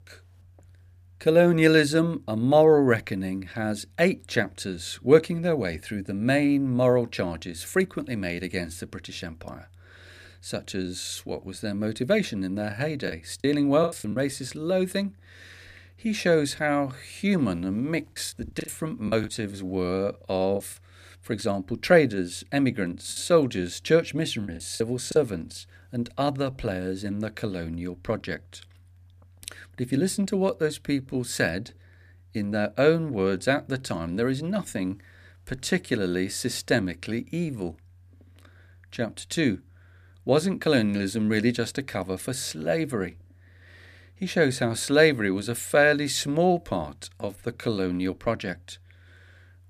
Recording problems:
choppy; very; from 13 to 14 s, from 18 to 21 s and from 23 to 25 s; 12% of the speech affected

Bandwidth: 15 kHz